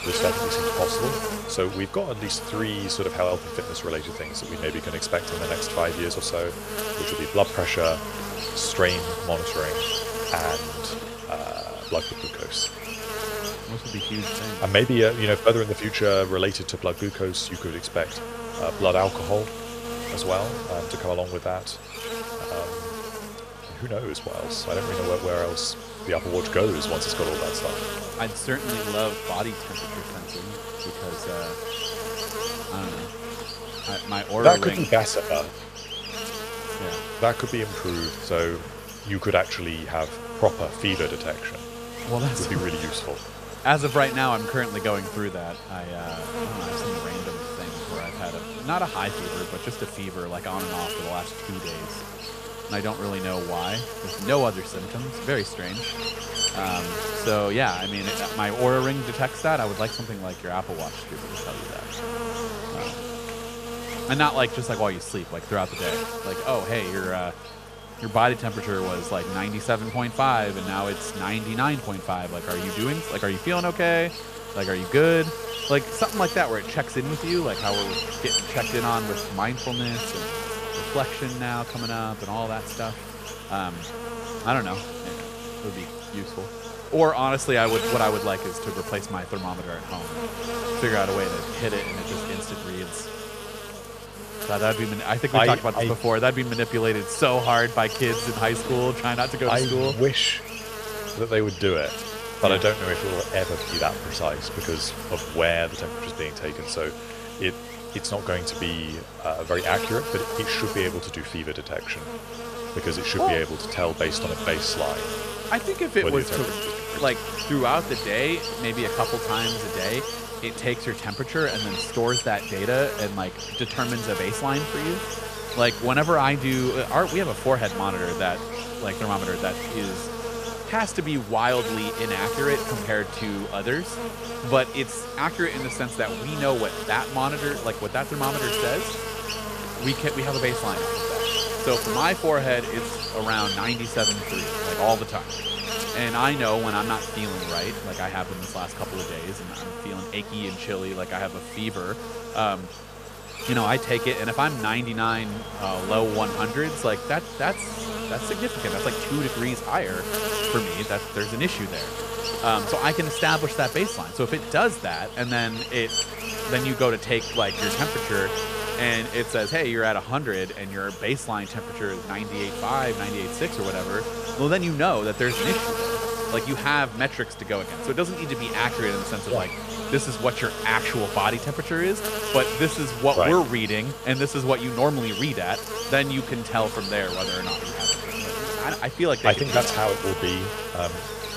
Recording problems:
electrical hum; loud; throughout; 50 Hz, 6 dB below the speech

